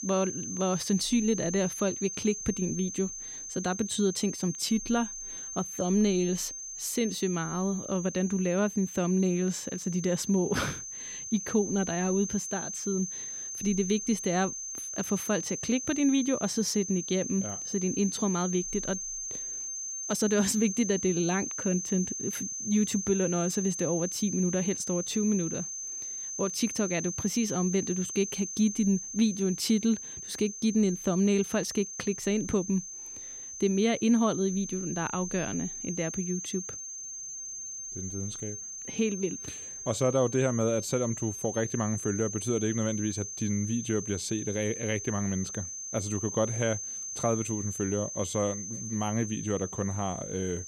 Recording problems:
high-pitched whine; loud; throughout; 6.5 kHz, 6 dB below the speech

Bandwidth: 16 kHz